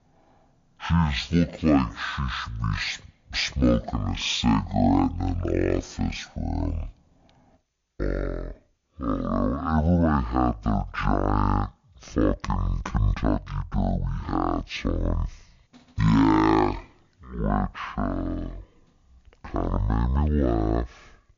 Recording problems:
wrong speed and pitch; too slow and too low; 0.5 times normal speed

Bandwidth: 7 kHz